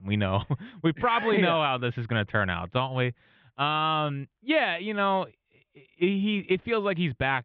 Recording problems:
muffled; very slightly; fading above 3.5 kHz

